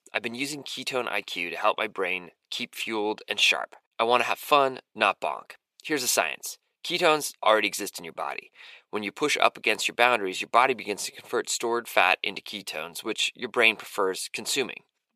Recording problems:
thin; somewhat; fading below 500 Hz

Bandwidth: 14.5 kHz